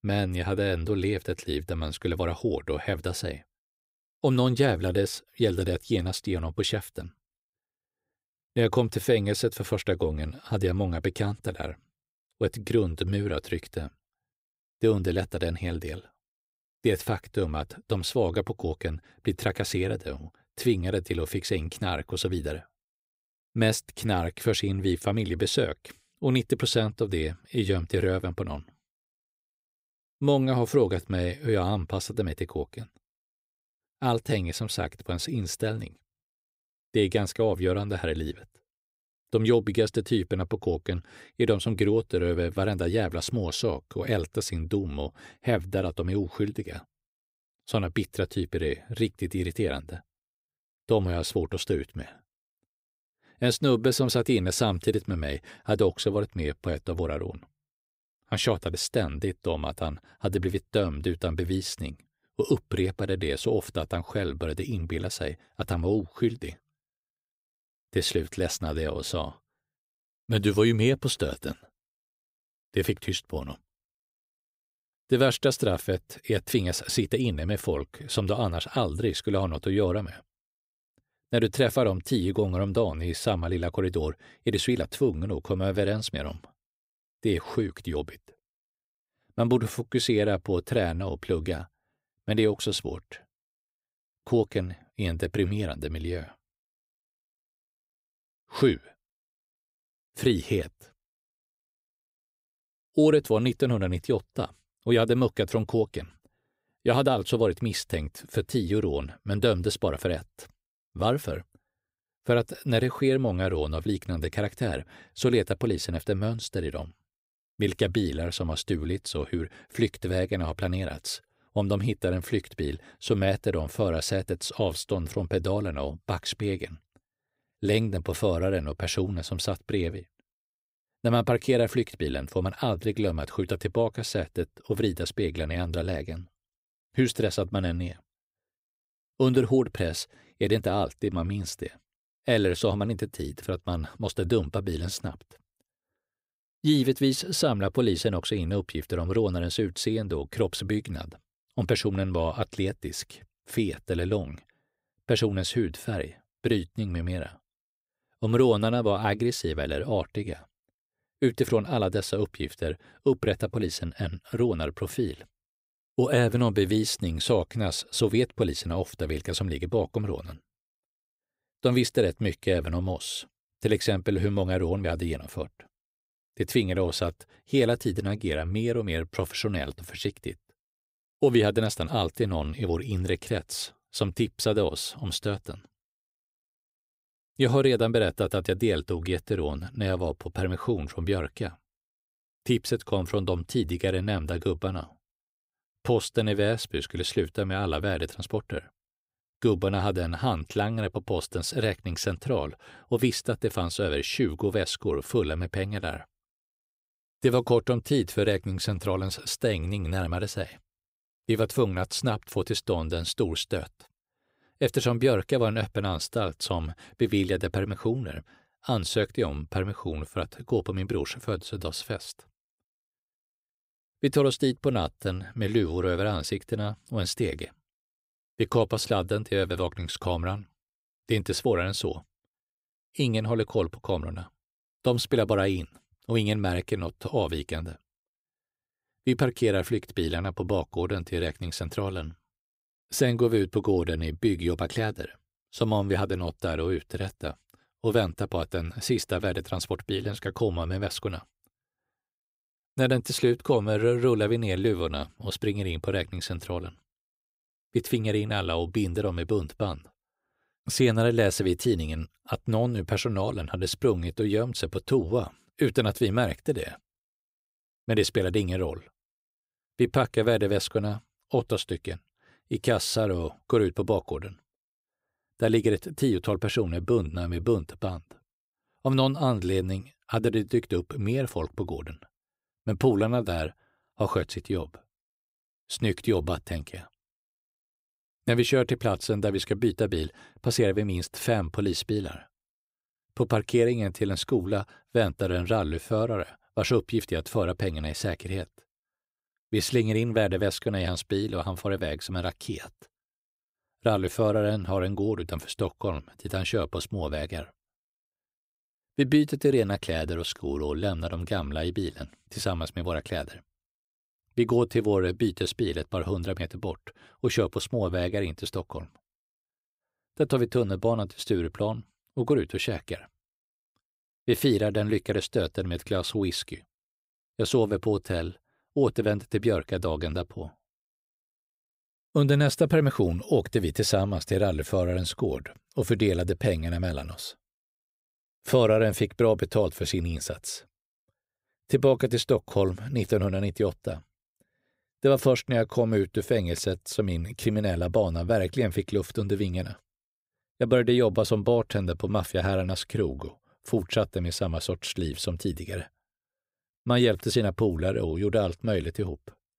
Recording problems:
none

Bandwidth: 15.5 kHz